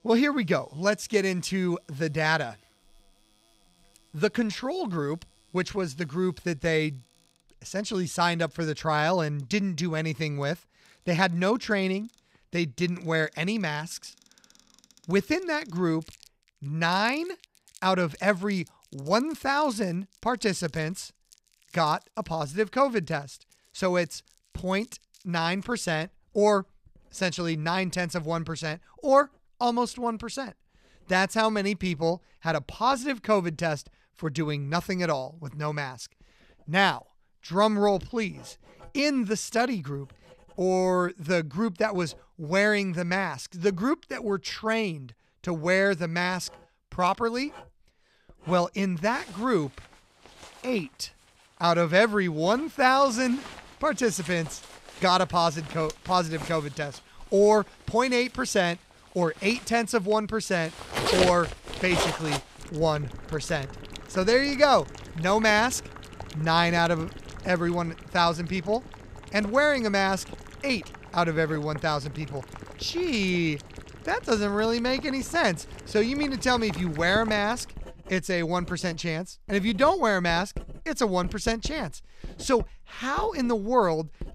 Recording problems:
household noises; noticeable; throughout; 15 dB below the speech

